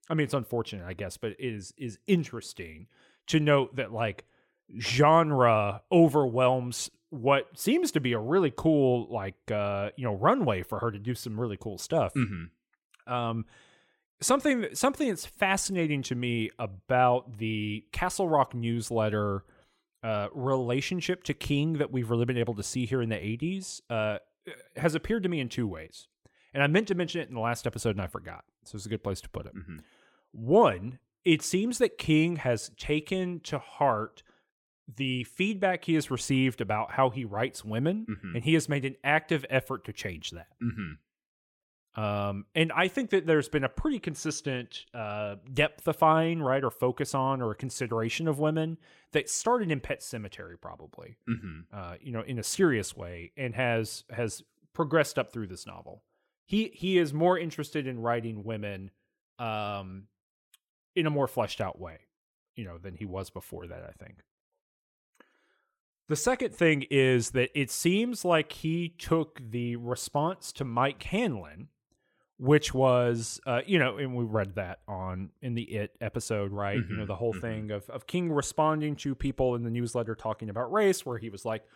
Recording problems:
none

